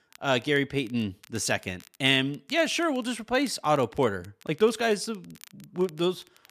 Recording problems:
crackle, like an old record; faint; 25 dB below the speech

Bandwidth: 14.5 kHz